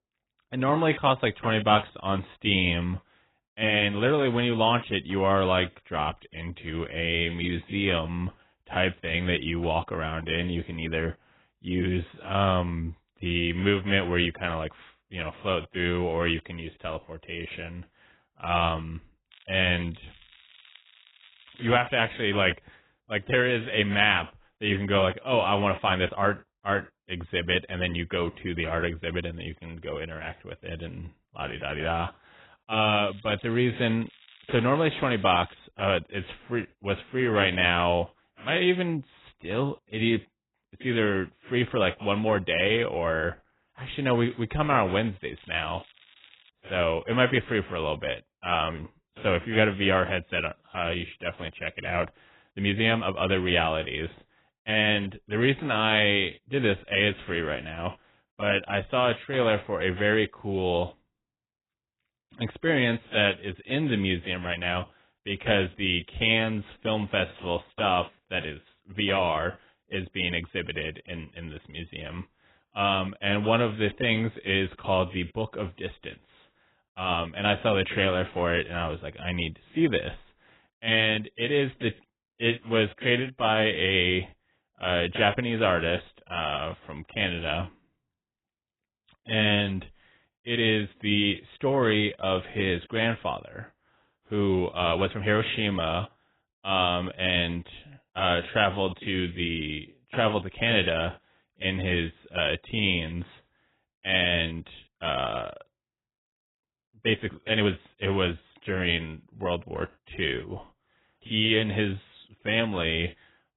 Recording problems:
garbled, watery; badly; nothing above 3.5 kHz
crackling; faint; from 19 to 22 s, from 33 to 36 s and from 45 to 46 s; 25 dB below the speech
uneven, jittery; strongly; from 3.5 s to 1:50

